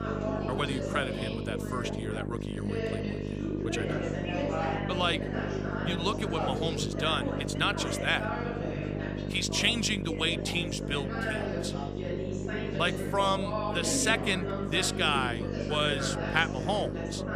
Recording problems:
background chatter; loud; throughout; 4 voices, 5 dB below the speech
electrical hum; noticeable; throughout; 50 Hz, 10 dB below the speech

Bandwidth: 15 kHz